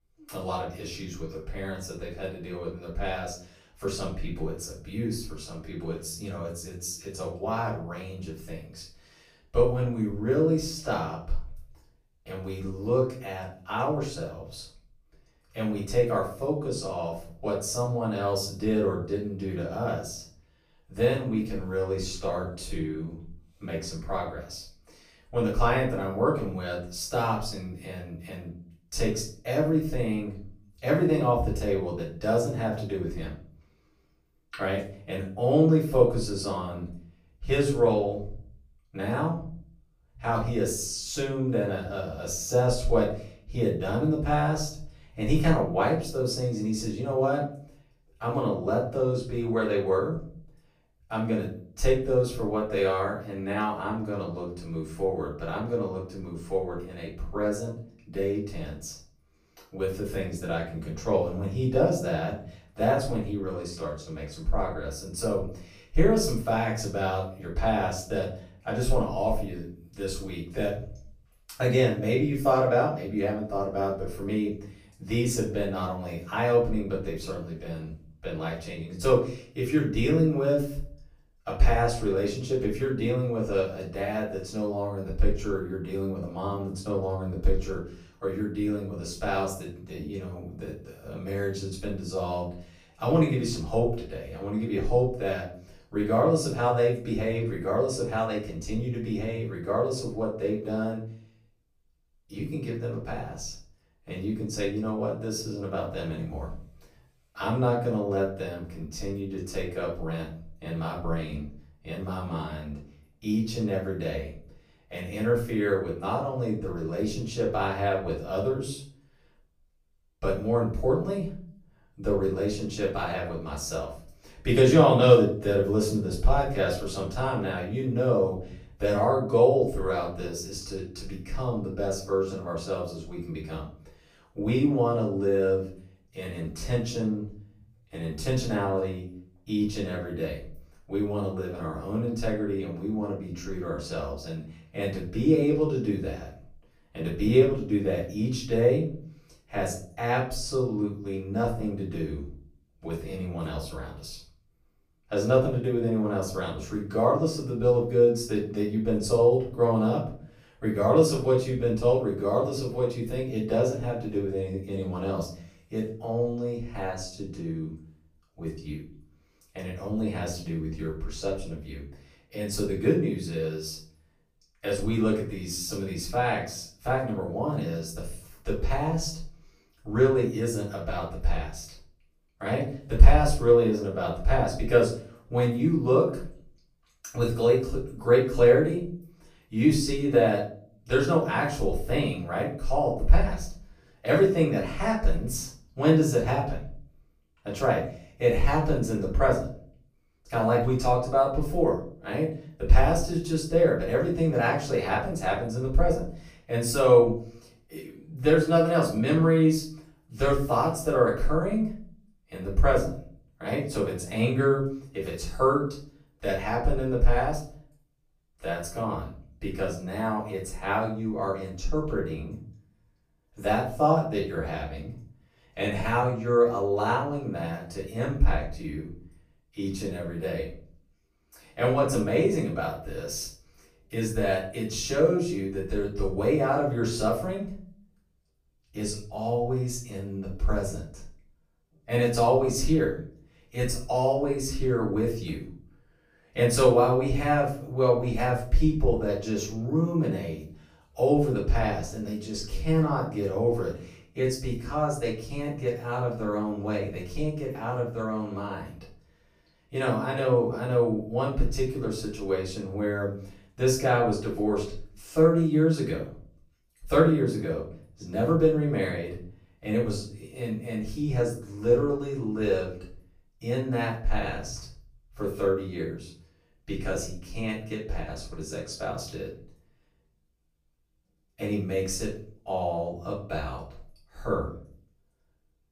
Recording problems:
off-mic speech; far
room echo; noticeable; dies away in 0.4 s

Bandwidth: 15 kHz